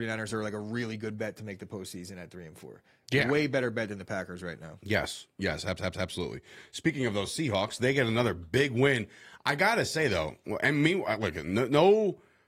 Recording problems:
garbled, watery; slightly; nothing above 15 kHz
abrupt cut into speech; at the start
audio stuttering; at 5.5 s

